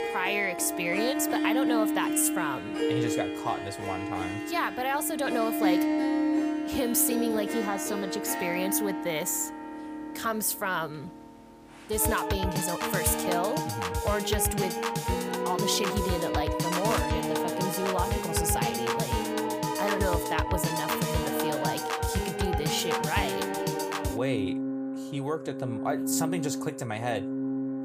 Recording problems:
background music; very loud; throughout; 1 dB above the speech

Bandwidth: 15 kHz